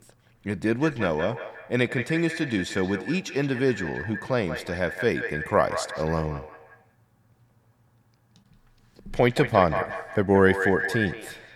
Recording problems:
echo of what is said; strong; throughout; 180 ms later, 7 dB below the speech

